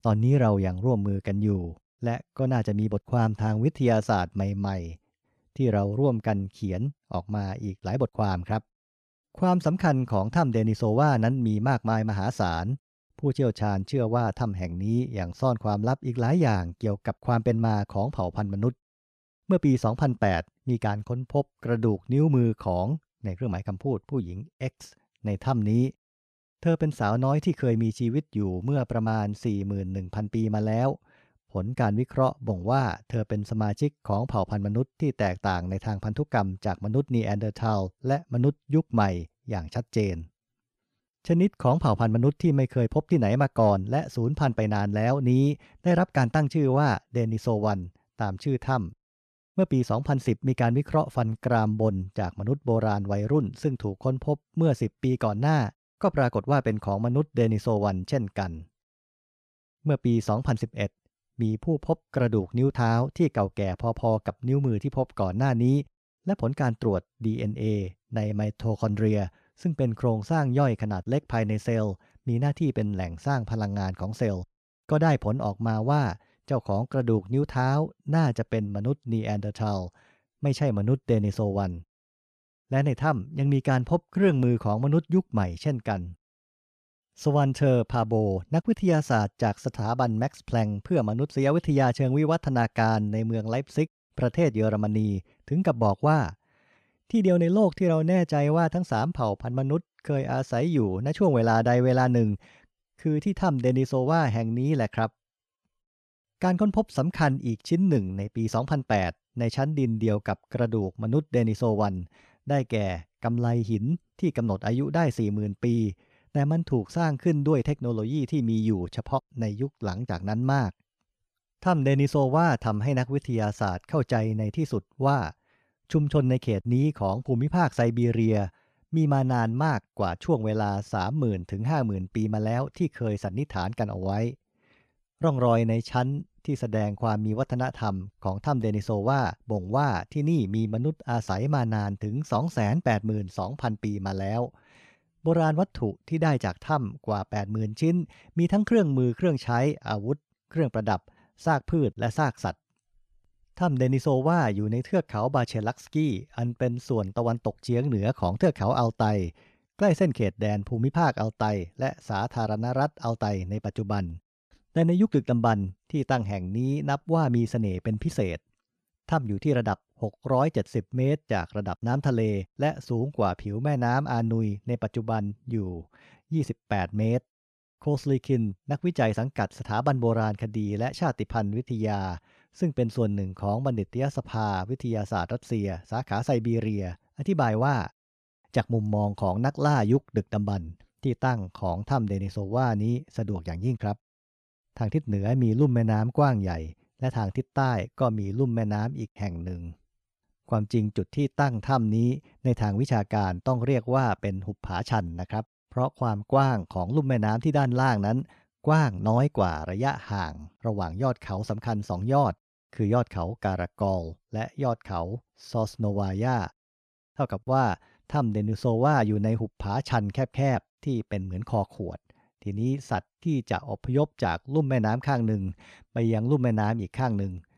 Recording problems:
none

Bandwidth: 14 kHz